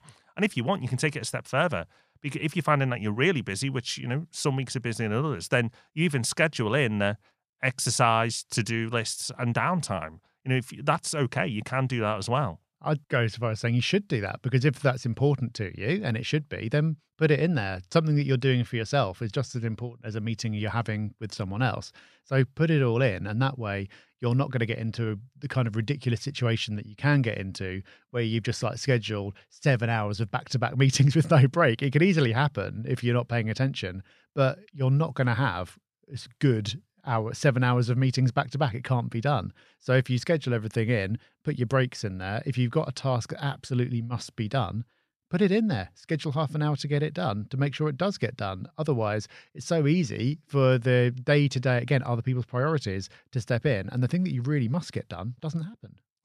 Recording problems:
none

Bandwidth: 14.5 kHz